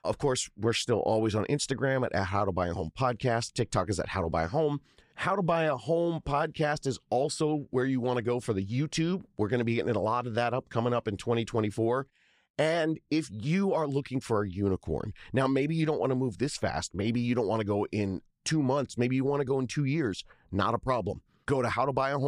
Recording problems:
abrupt cut into speech; at the end

